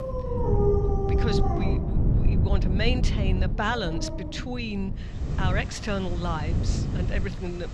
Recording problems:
animal sounds; very loud; throughout; 1 dB above the speech
wind noise on the microphone; heavy; 7 dB below the speech

